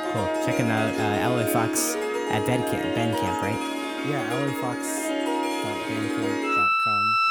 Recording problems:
background music; very loud; throughout; 4 dB above the speech

